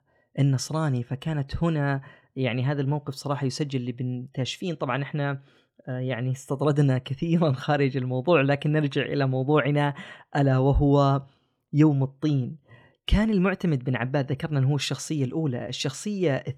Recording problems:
none

